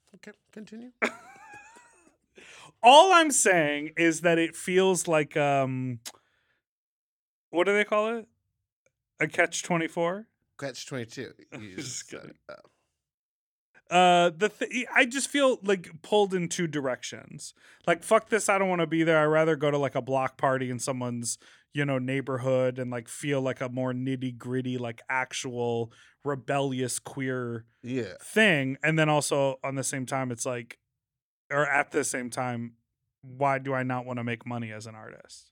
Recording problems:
uneven, jittery; slightly; from 11 to 32 s

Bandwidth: 18.5 kHz